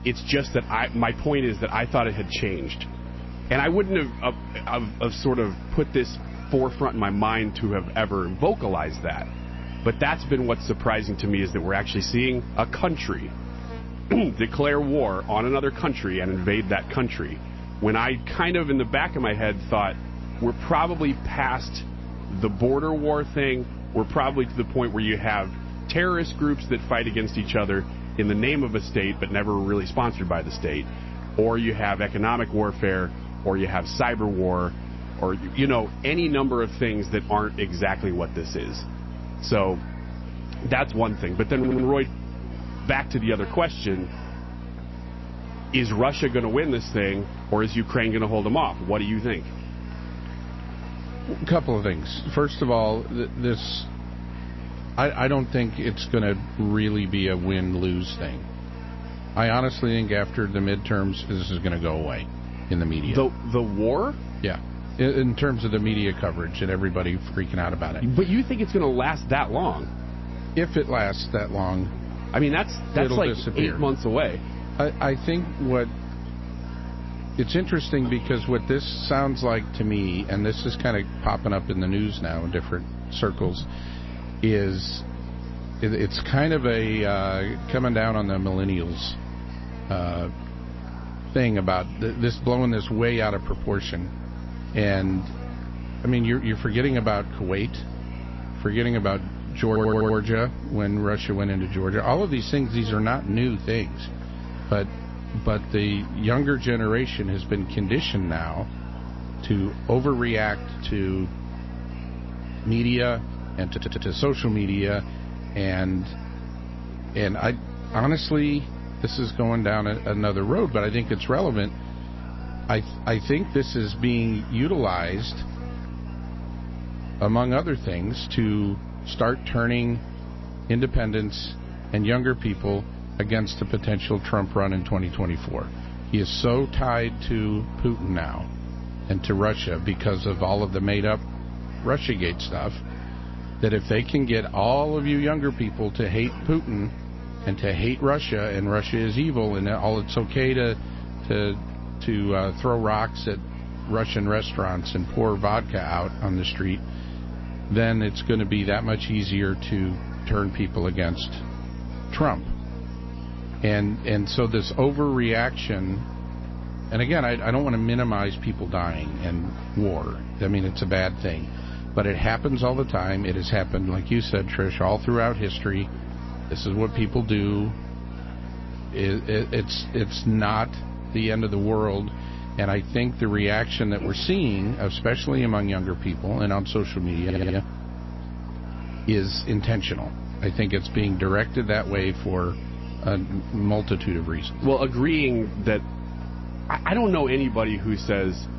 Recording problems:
garbled, watery; slightly; nothing above 5.5 kHz
electrical hum; noticeable; throughout; 60 Hz, 15 dB below the speech
murmuring crowd; faint; throughout; 25 dB below the speech
audio stuttering; 4 times, first at 42 s

